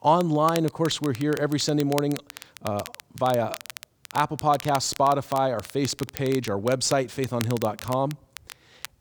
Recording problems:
crackle, like an old record; noticeable; 15 dB below the speech

